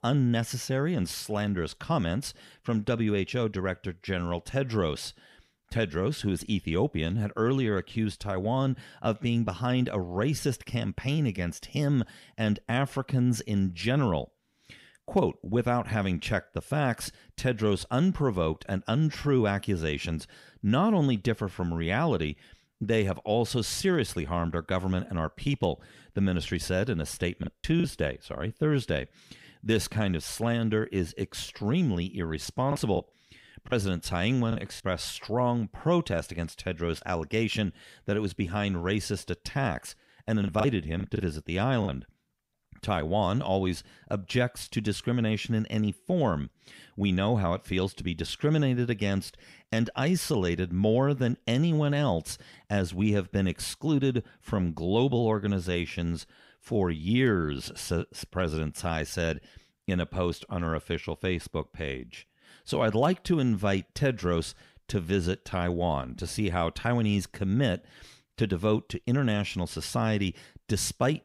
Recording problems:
choppy; very; at 27 s, from 33 to 35 s and from 40 to 42 s; 8% of the speech affected

